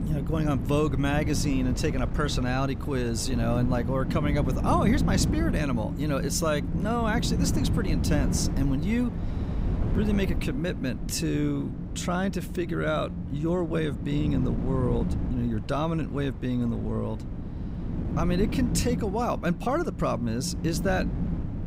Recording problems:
wind noise on the microphone; heavy; 9 dB below the speech

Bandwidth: 15.5 kHz